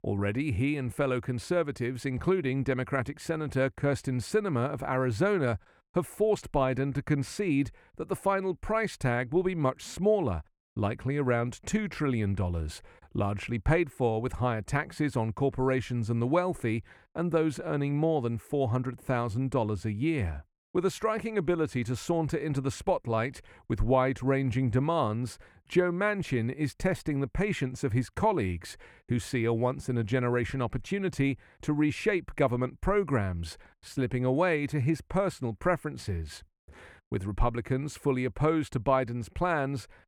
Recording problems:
muffled; slightly; fading above 3.5 kHz

